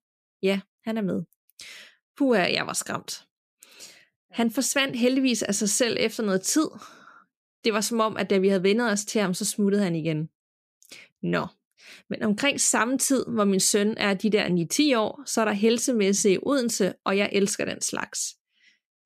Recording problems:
none

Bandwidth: 14.5 kHz